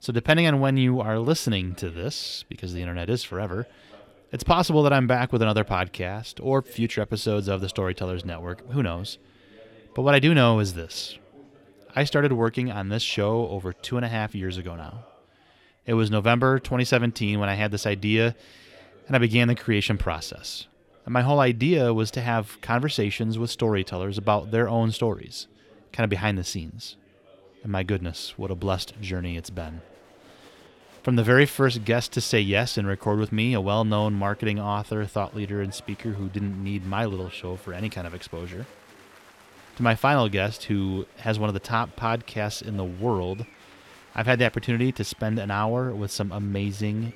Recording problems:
chatter from many people; faint; throughout; 25 dB below the speech

